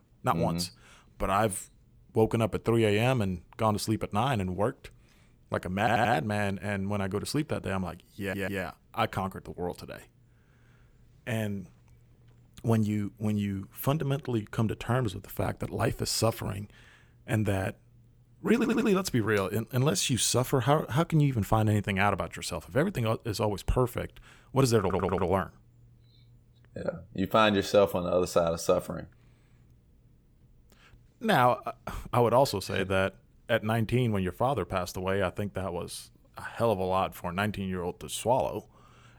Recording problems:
audio stuttering; 4 times, first at 6 s

